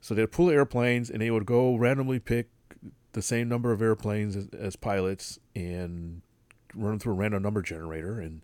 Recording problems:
none

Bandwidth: 18.5 kHz